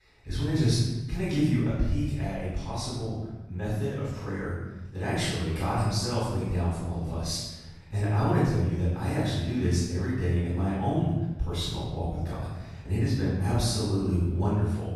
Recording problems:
room echo; strong; dies away in 1.1 s
off-mic speech; far

